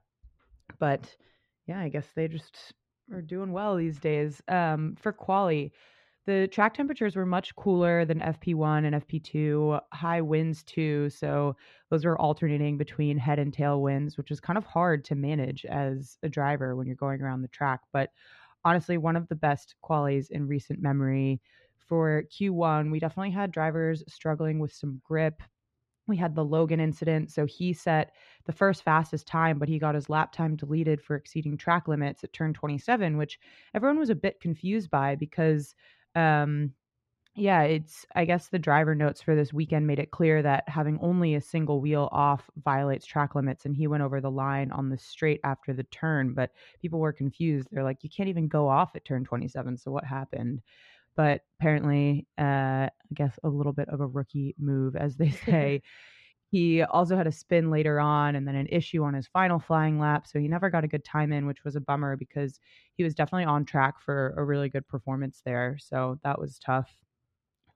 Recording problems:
muffled; slightly; fading above 2.5 kHz

